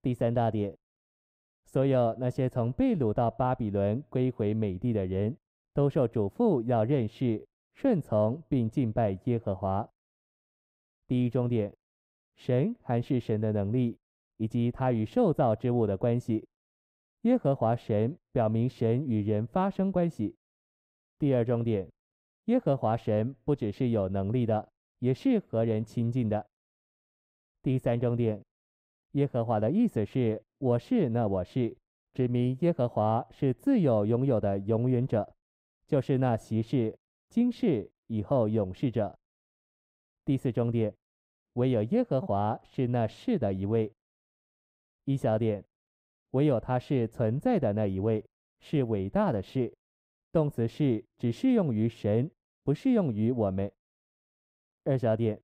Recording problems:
muffled; very; fading above 1.5 kHz

